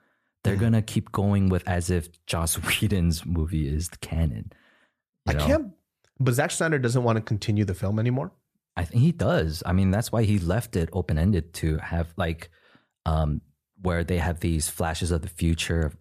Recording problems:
none

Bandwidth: 14.5 kHz